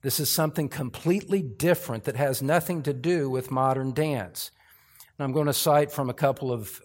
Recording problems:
none

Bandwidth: 16 kHz